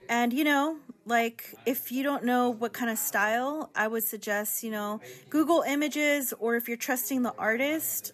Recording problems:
background chatter; faint; throughout; 4 voices, 25 dB below the speech

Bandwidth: 13.5 kHz